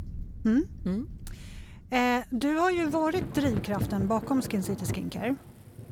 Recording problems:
rain or running water; loud; throughout; 10 dB below the speech

